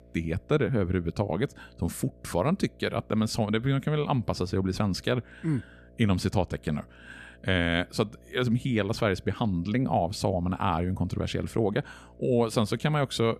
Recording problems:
electrical hum; faint; throughout; 60 Hz, 30 dB below the speech

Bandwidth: 14.5 kHz